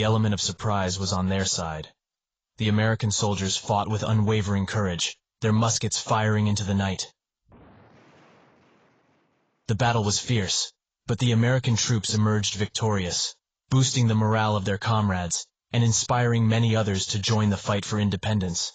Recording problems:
garbled, watery; badly; nothing above 7.5 kHz
abrupt cut into speech; at the start

